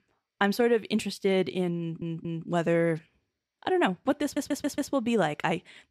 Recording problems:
audio stuttering; at 2 s and at 4 s

